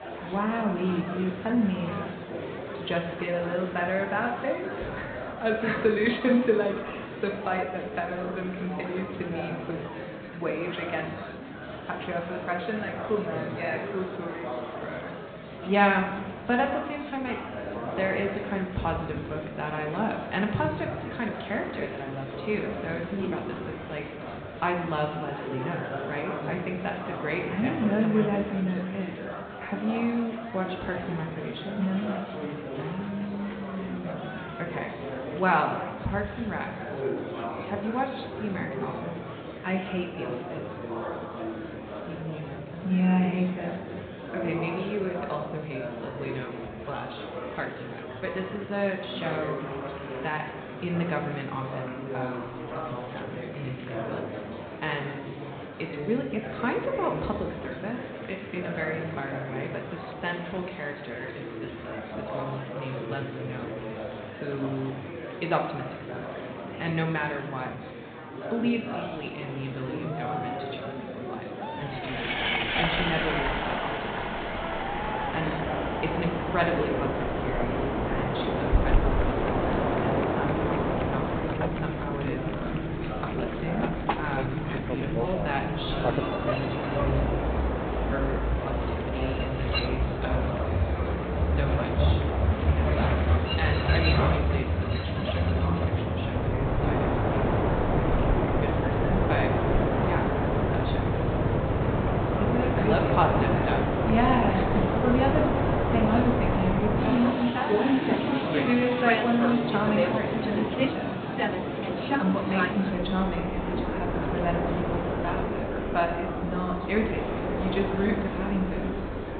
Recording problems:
high frequencies cut off; severe; nothing above 4 kHz
room echo; slight; dies away in 0.8 s
off-mic speech; somewhat distant
train or aircraft noise; very loud; from 1:13 on; 3 dB above the speech
murmuring crowd; loud; throughout; 6 dB below the speech

